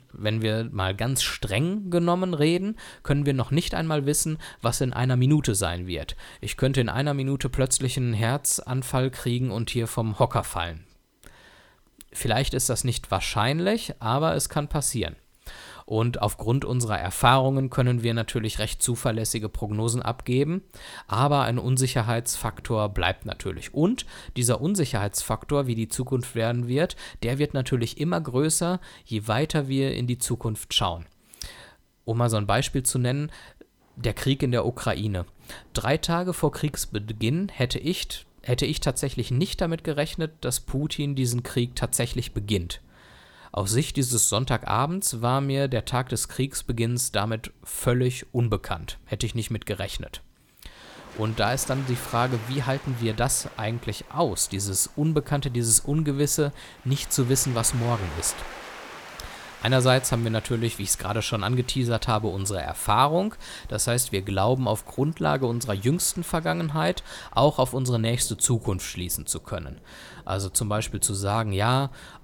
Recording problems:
rain or running water; faint; throughout; 20 dB below the speech

